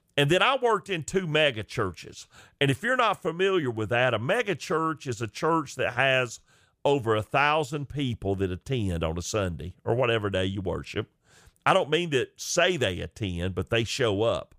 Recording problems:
none

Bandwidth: 15 kHz